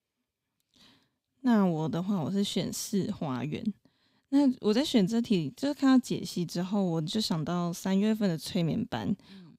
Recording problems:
none

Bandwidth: 15.5 kHz